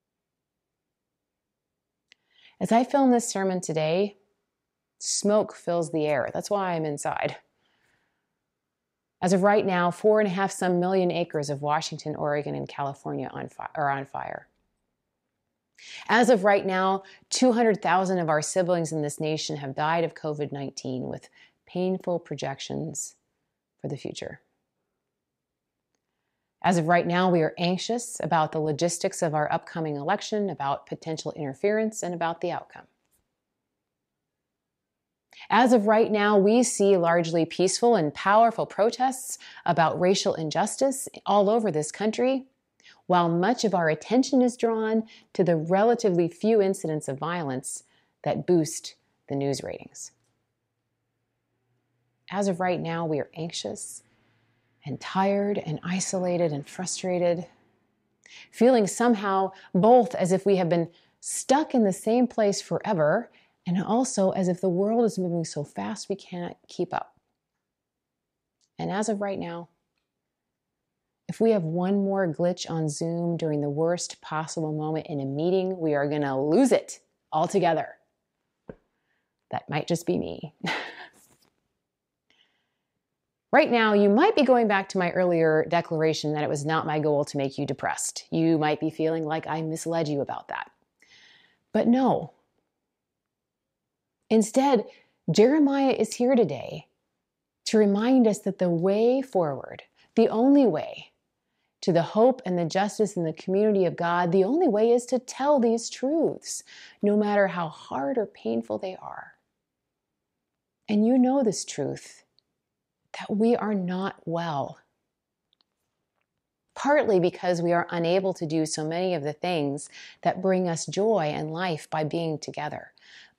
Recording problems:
none

